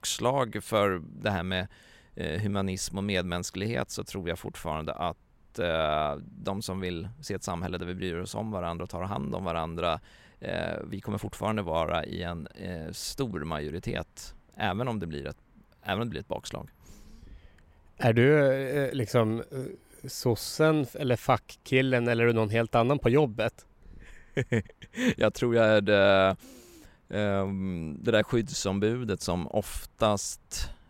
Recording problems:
none

